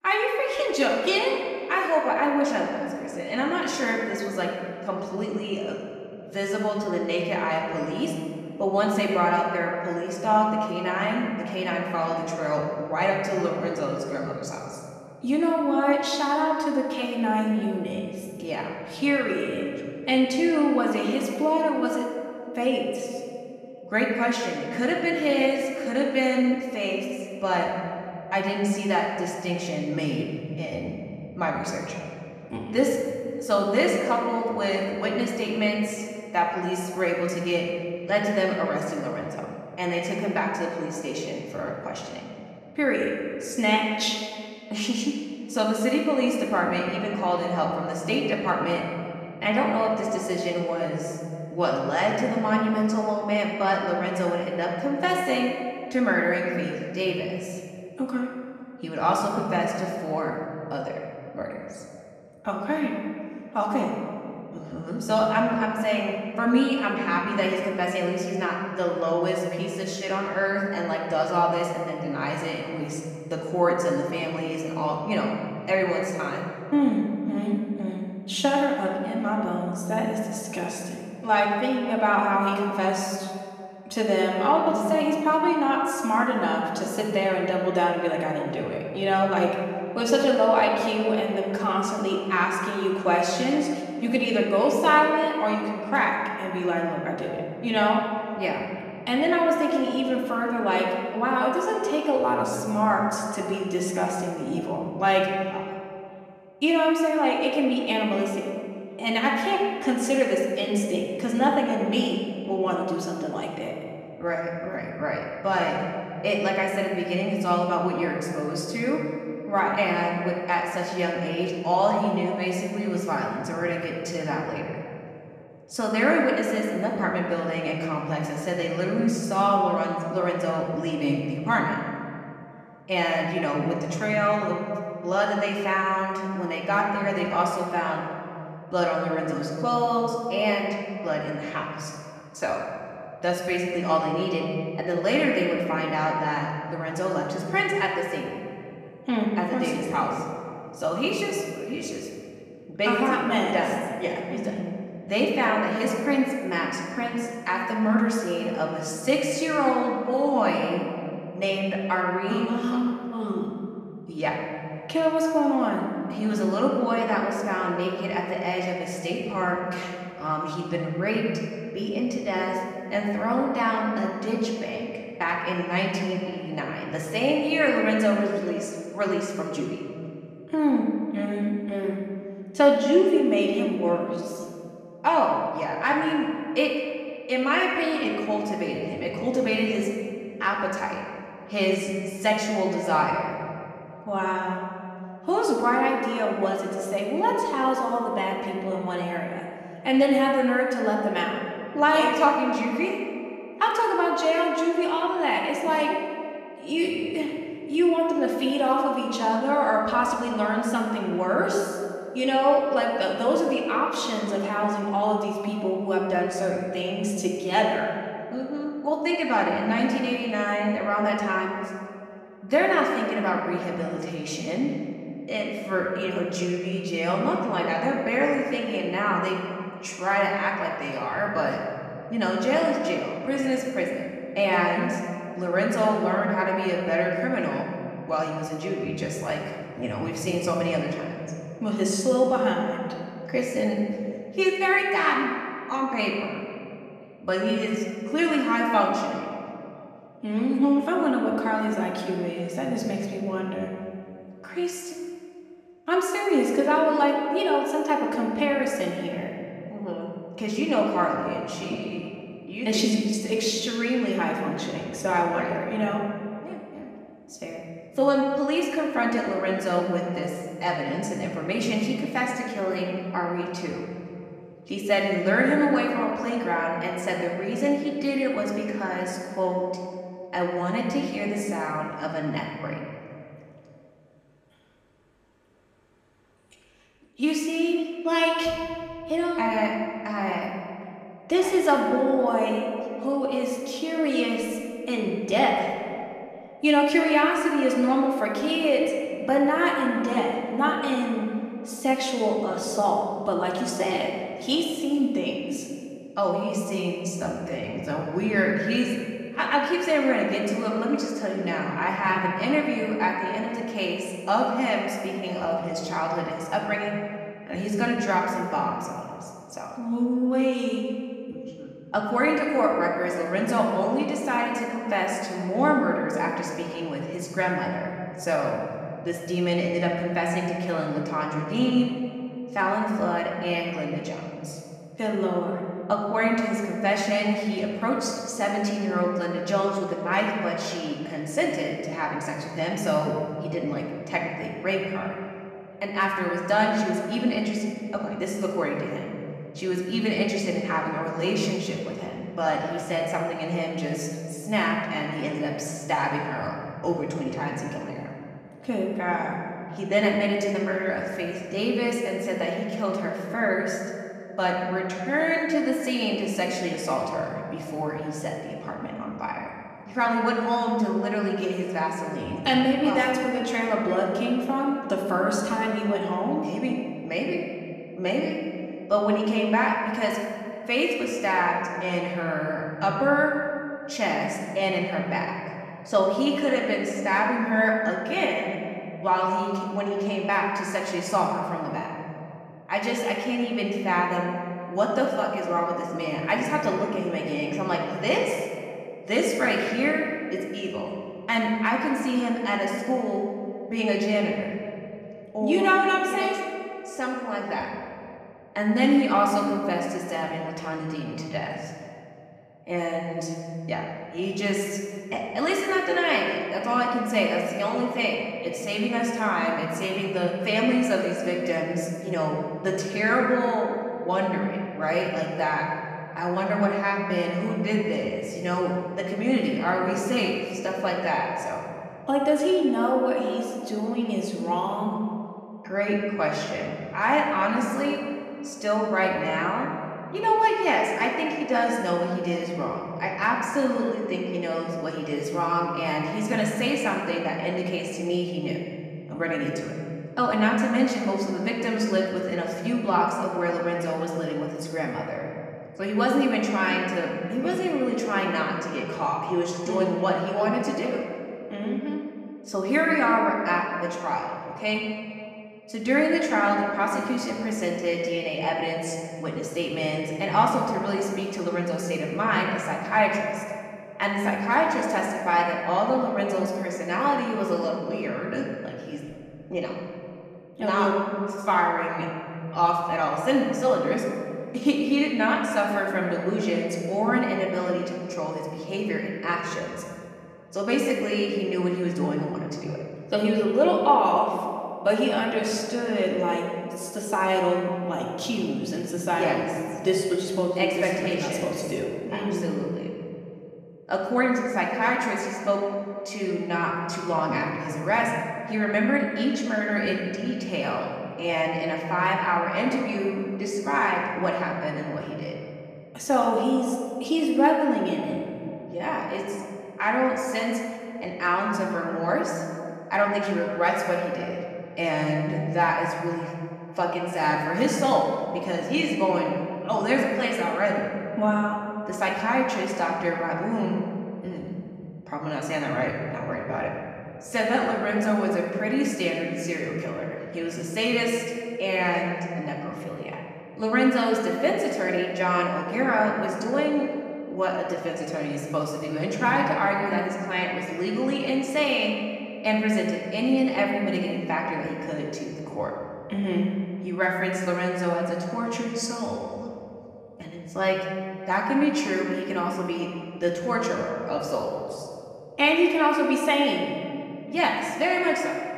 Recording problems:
off-mic speech; far
room echo; noticeable; dies away in 2.1 s
echo of what is said; faint; throughout; 510 ms later, 25 dB below the speech

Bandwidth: 14.5 kHz